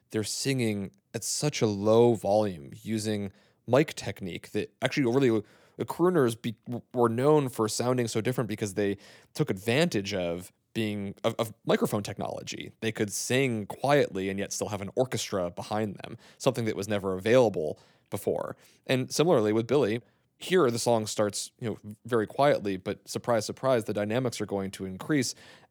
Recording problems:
none

